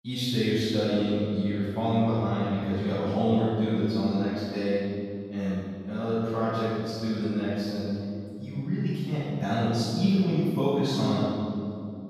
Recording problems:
room echo; strong; dies away in 2.4 s
off-mic speech; far

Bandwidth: 14.5 kHz